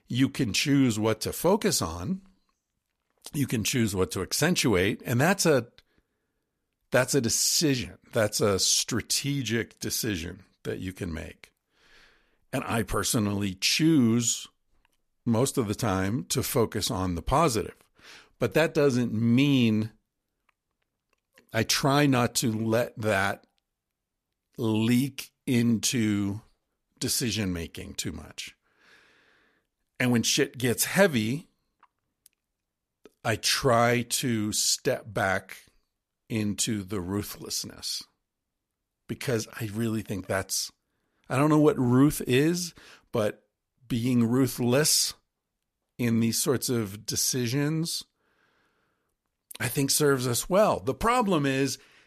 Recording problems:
none

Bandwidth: 14.5 kHz